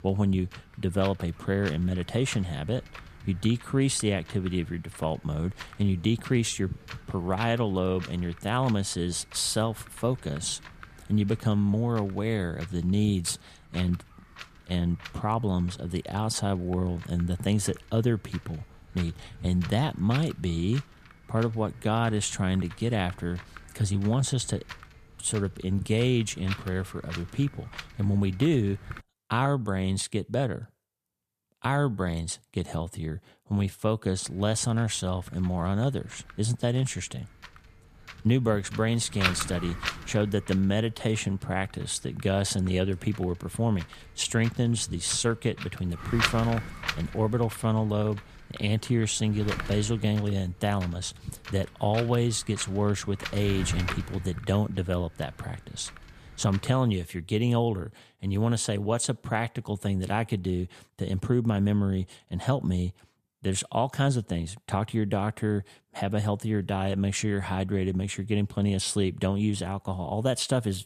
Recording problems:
wind noise on the microphone; heavy; until 29 s and from 34 to 57 s; 8 dB below the speech

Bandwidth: 14.5 kHz